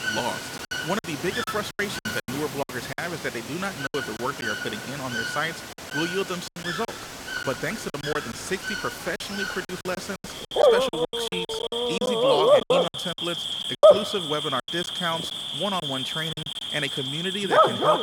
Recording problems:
animal sounds; very loud; throughout; 5 dB above the speech
rain or running water; noticeable; until 12 s; 15 dB below the speech
choppy; very; 11% of the speech affected

